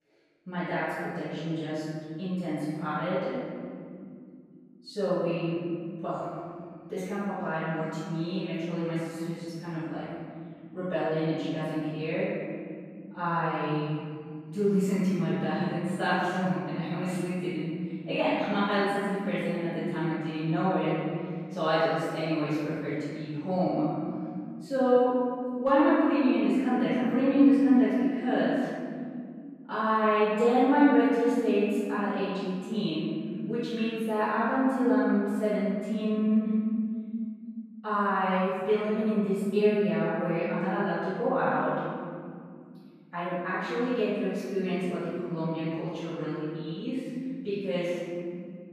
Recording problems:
room echo; strong; dies away in 2.8 s
off-mic speech; far

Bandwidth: 14.5 kHz